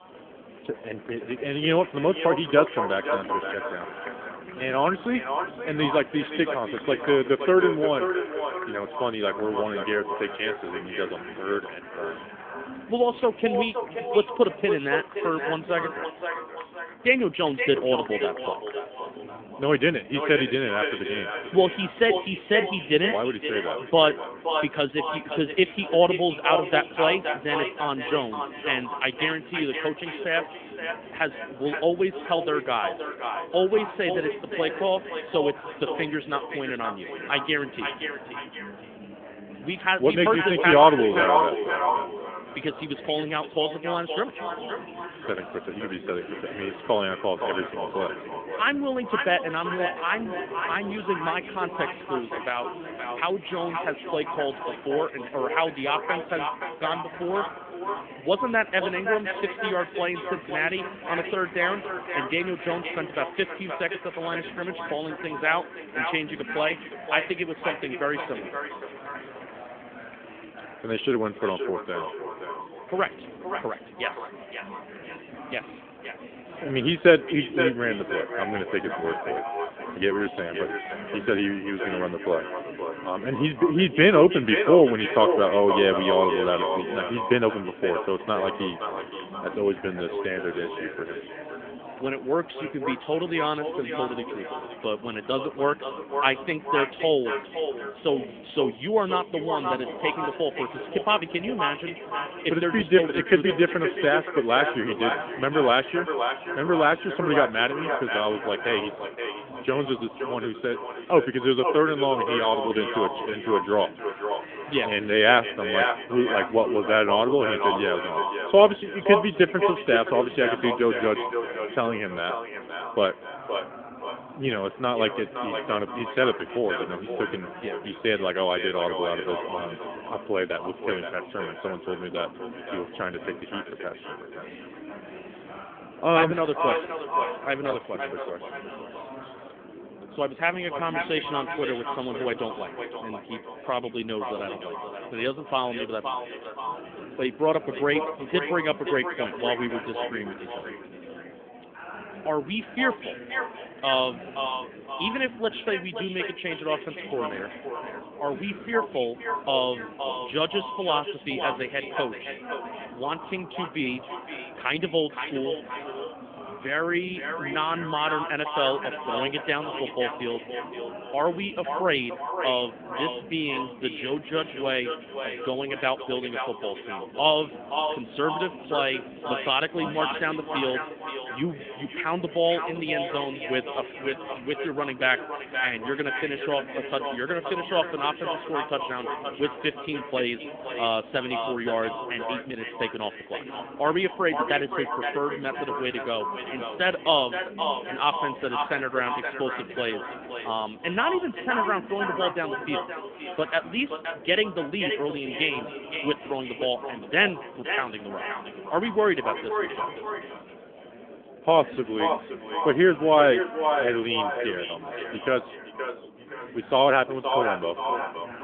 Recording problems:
echo of what is said; strong; throughout; 520 ms later, 6 dB below the speech
phone-call audio; nothing above 3.5 kHz
murmuring crowd; noticeable; throughout; 15 dB below the speech

